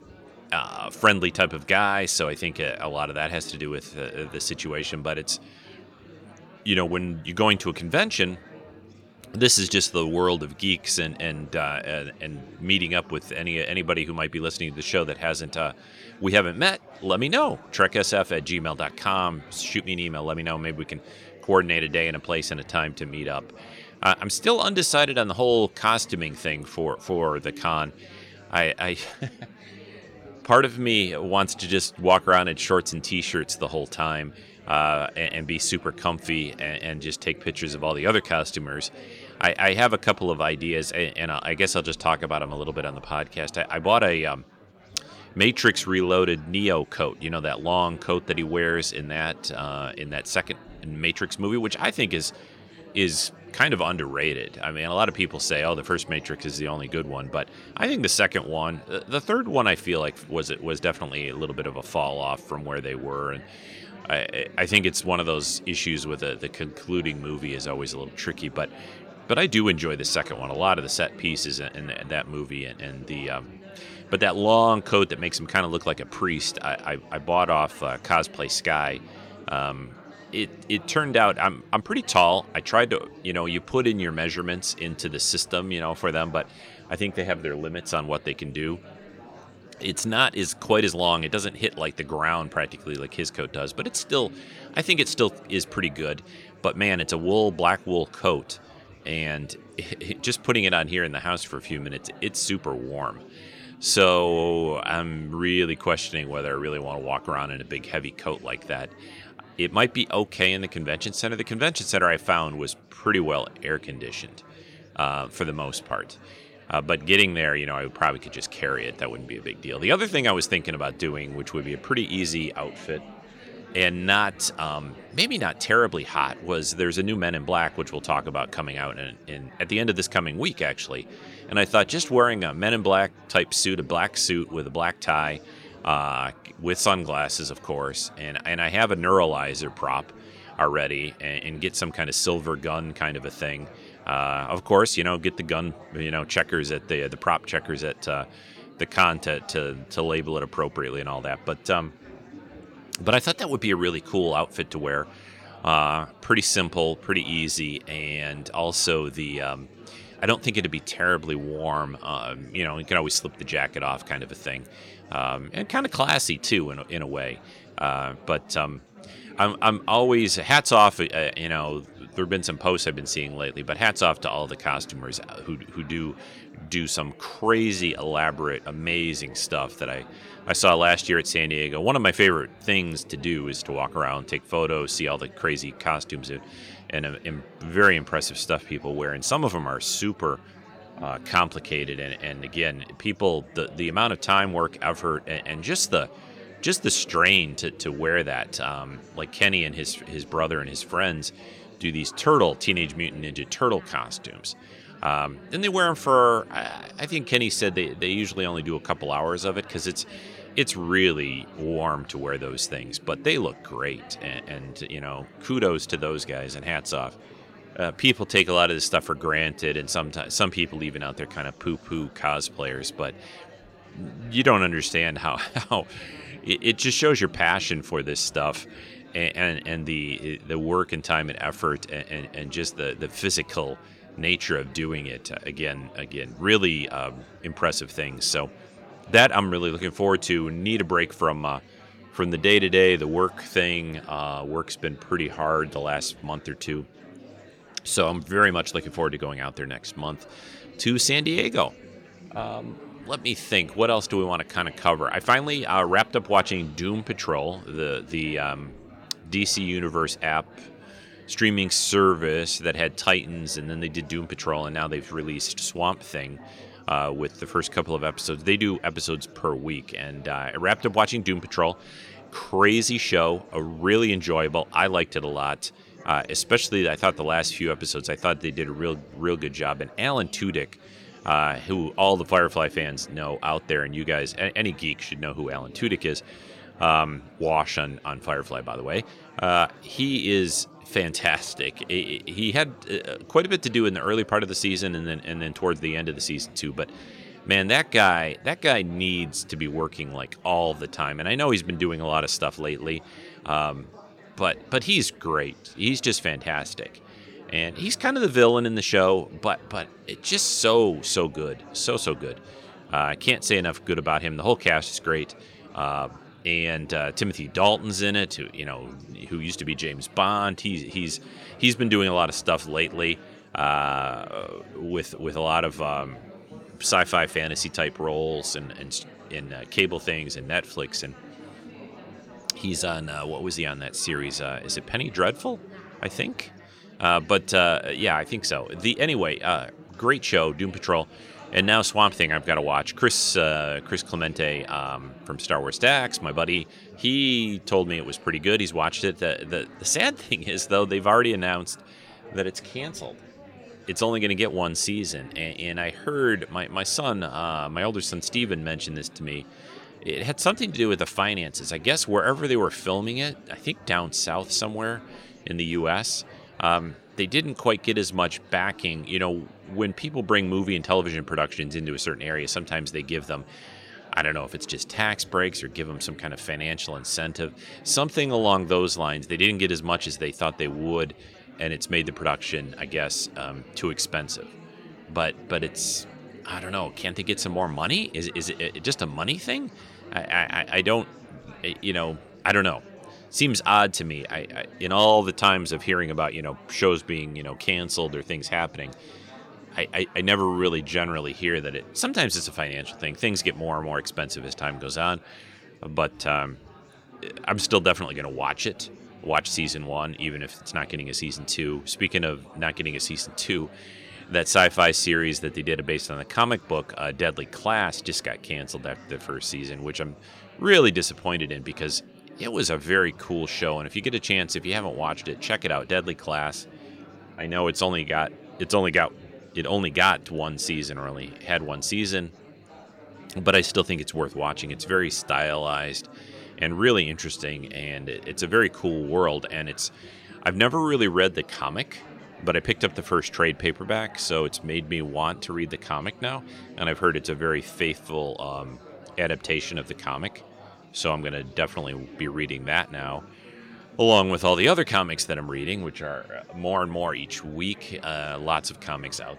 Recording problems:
chatter from many people; faint; throughout; 20 dB below the speech

